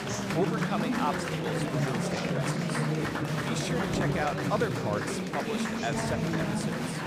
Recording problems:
murmuring crowd; very loud; throughout; 5 dB above the speech

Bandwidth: 15.5 kHz